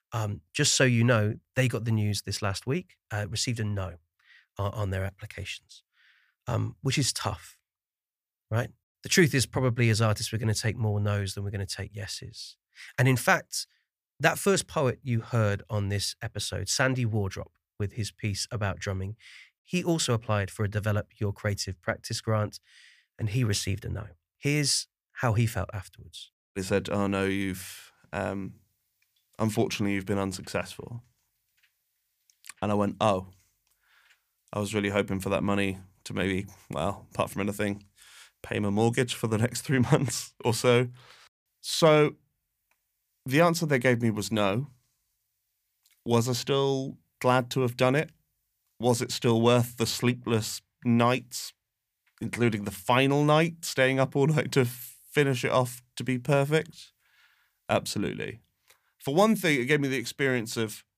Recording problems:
none

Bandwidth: 15 kHz